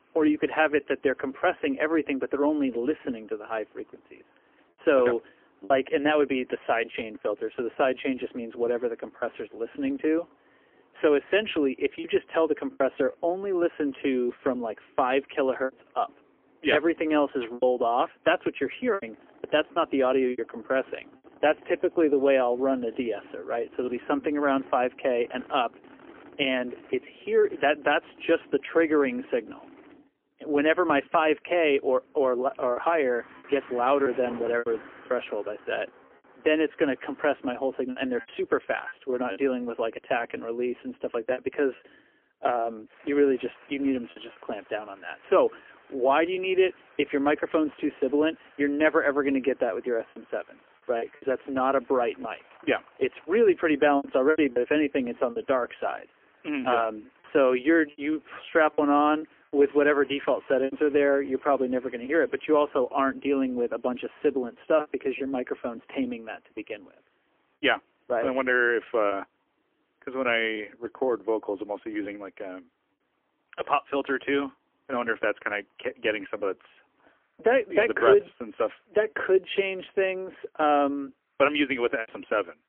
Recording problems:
phone-call audio; poor line; nothing above 3 kHz
traffic noise; faint; throughout; 25 dB below the speech
choppy; occasionally; 3% of the speech affected

